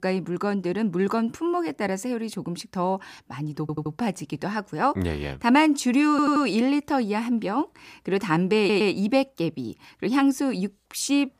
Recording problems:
audio stuttering; at 3.5 s, at 6 s and at 8.5 s

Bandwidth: 15 kHz